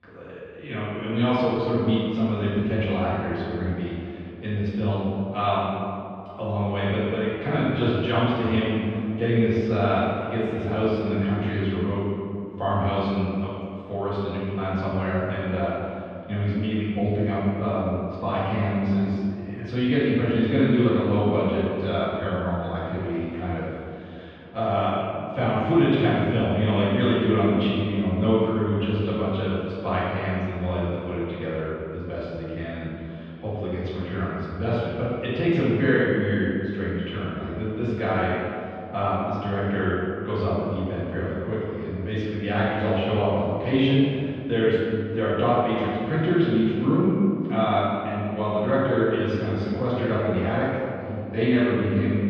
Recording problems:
room echo; strong; dies away in 2.2 s
off-mic speech; far
muffled; very; fading above 3.5 kHz

